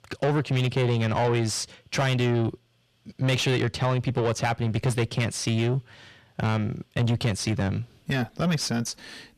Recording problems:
distortion; heavy; 7 dB below the speech

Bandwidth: 14 kHz